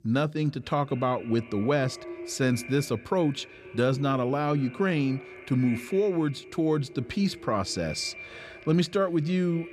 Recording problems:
echo of what is said; noticeable; throughout; 240 ms later, 15 dB below the speech

